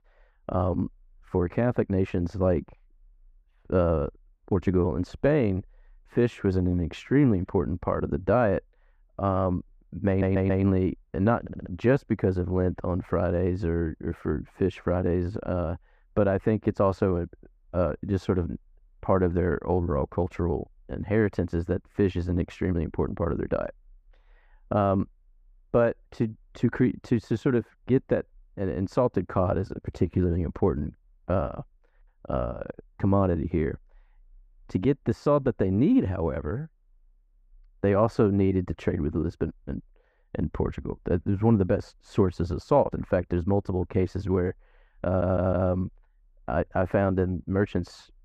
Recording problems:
muffled; very; fading above 2 kHz
audio stuttering; at 10 s, at 11 s and at 45 s

